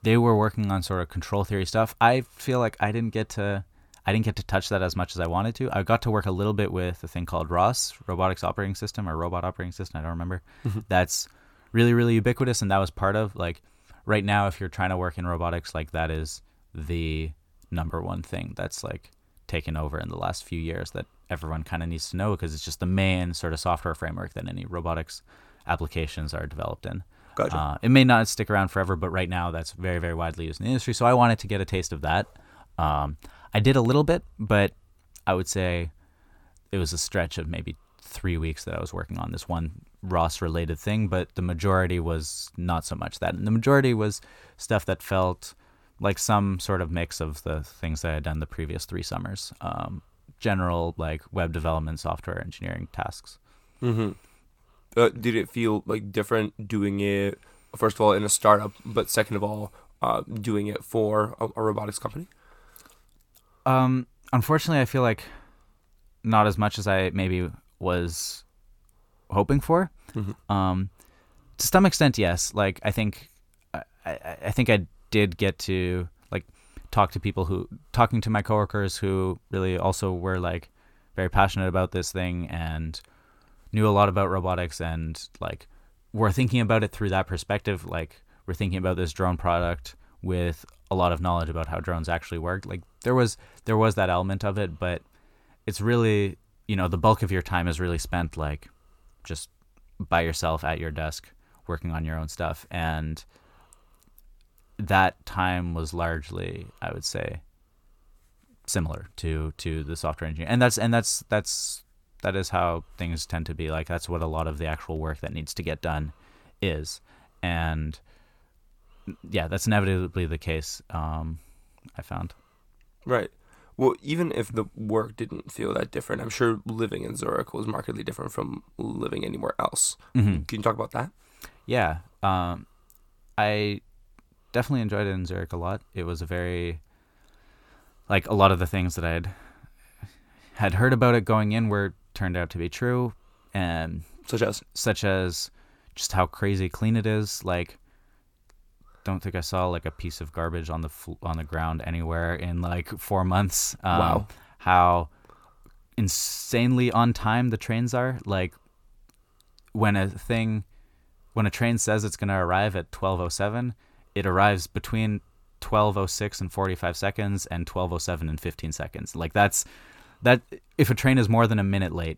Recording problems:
none

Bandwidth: 17 kHz